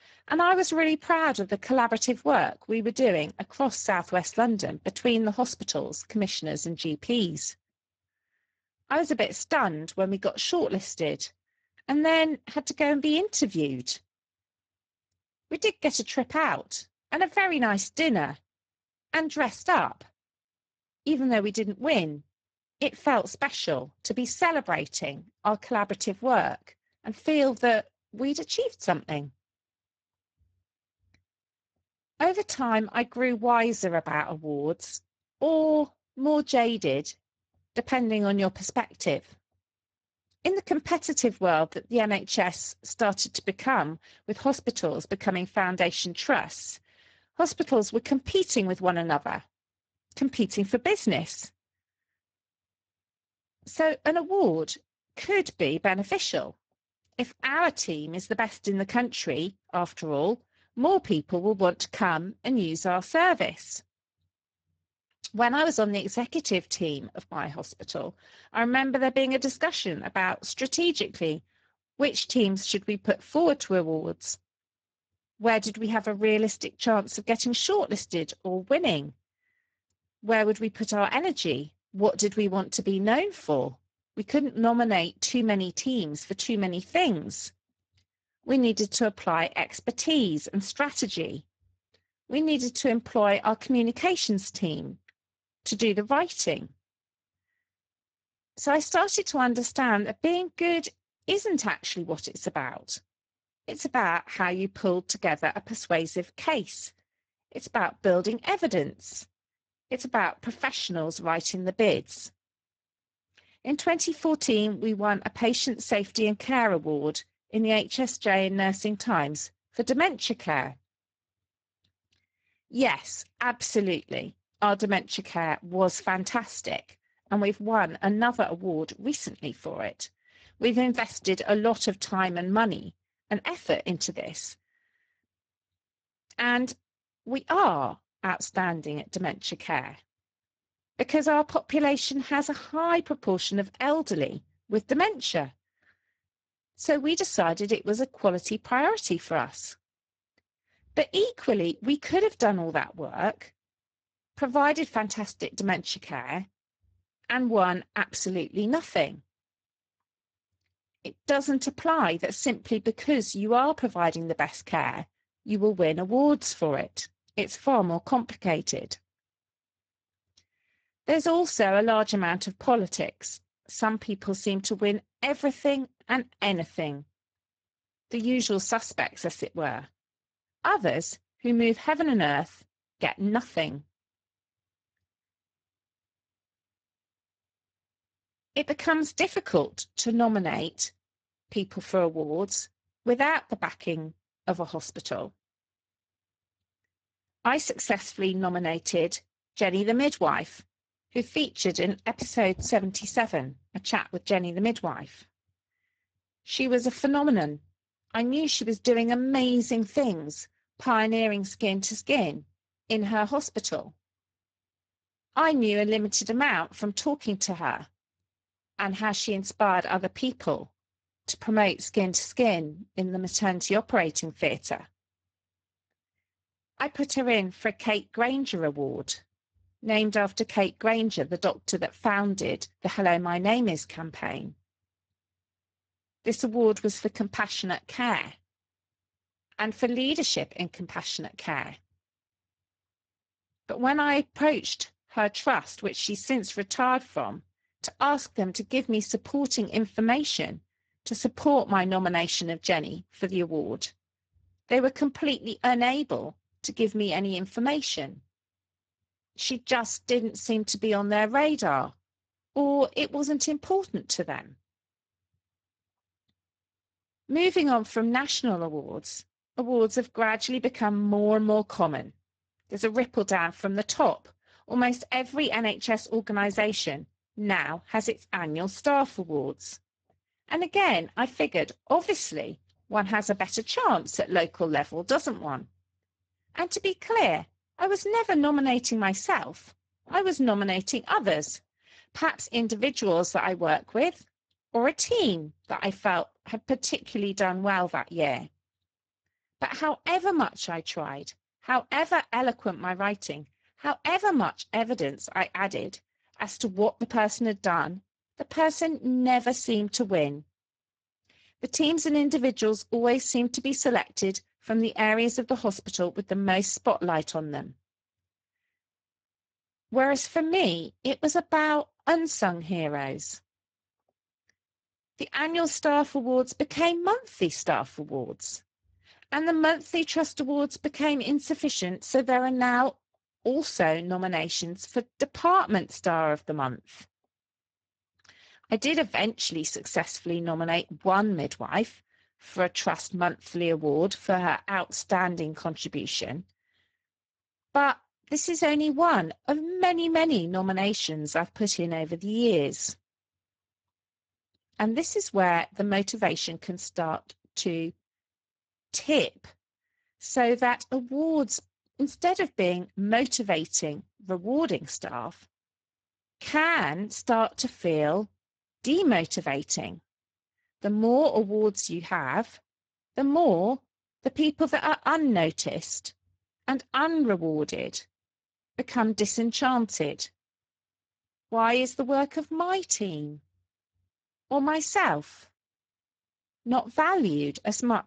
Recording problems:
garbled, watery; badly; nothing above 7.5 kHz

